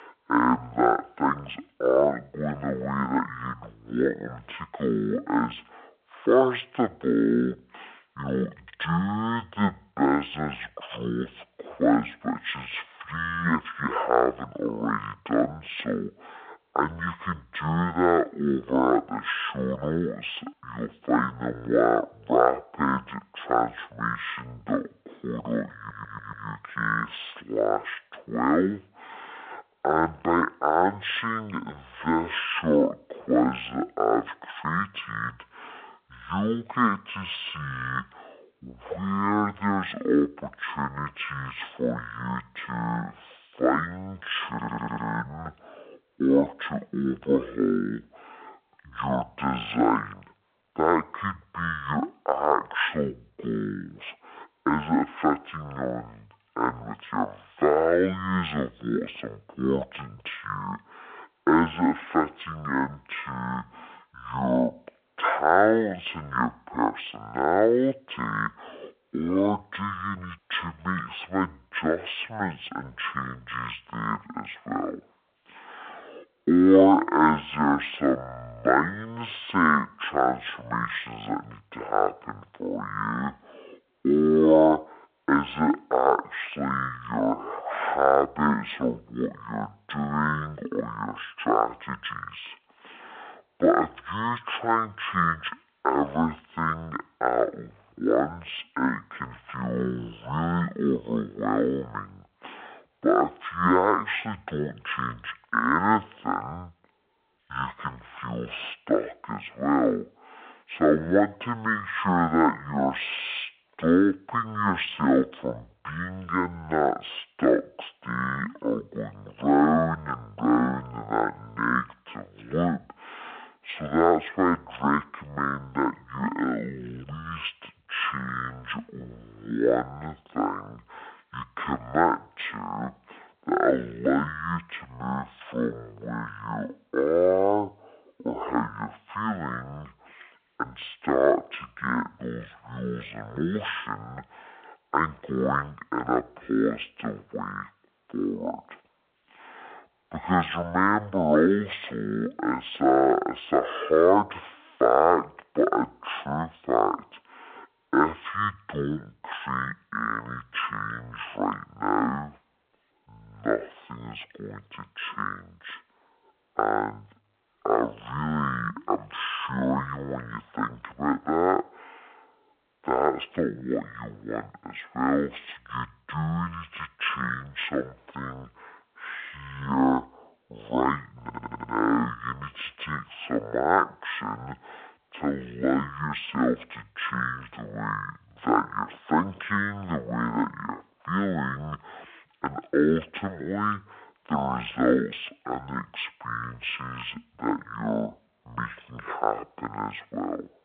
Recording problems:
wrong speed and pitch; too slow and too low; 0.5 times normal speed
phone-call audio
audio stuttering; at 26 s, at 44 s and at 3:01

